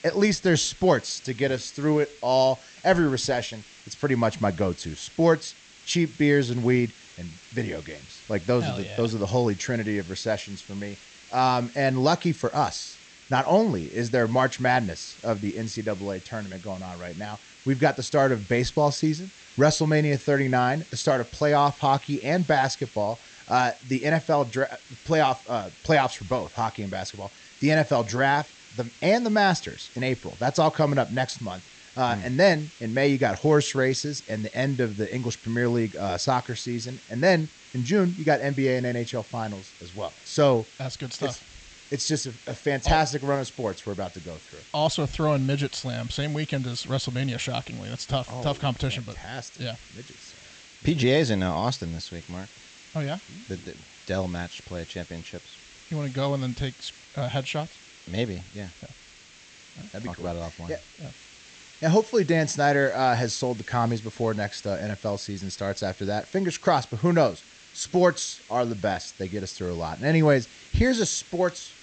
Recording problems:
high frequencies cut off; noticeable; nothing above 8 kHz
hiss; faint; throughout; 20 dB below the speech

